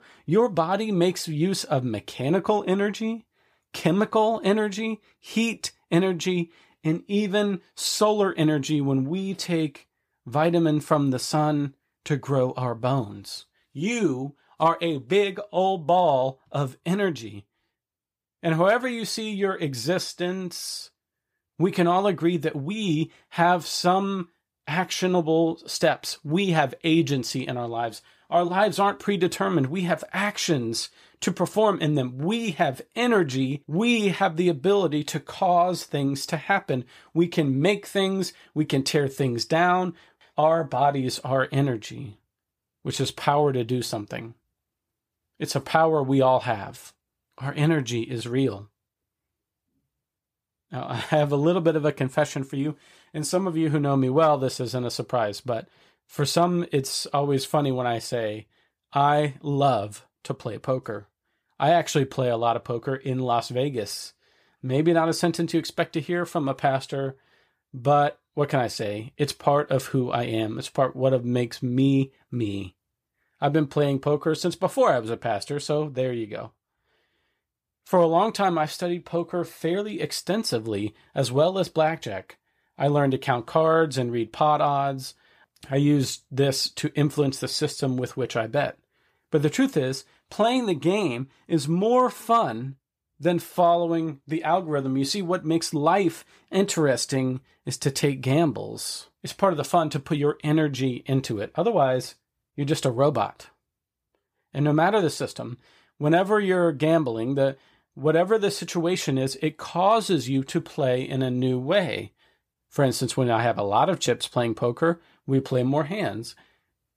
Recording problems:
none

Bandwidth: 15 kHz